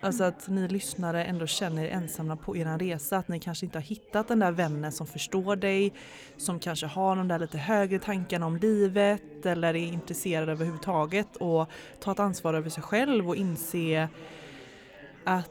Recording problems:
background chatter; noticeable; throughout; 4 voices, 20 dB below the speech

